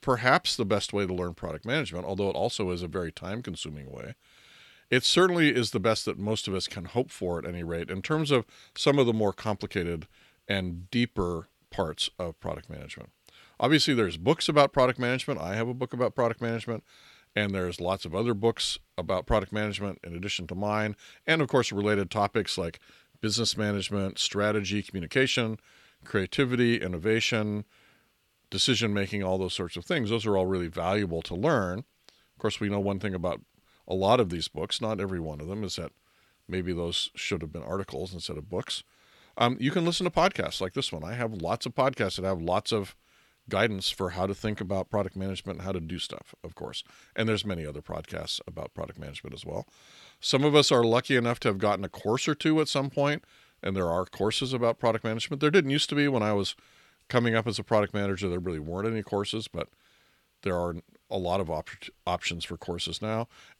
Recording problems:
none

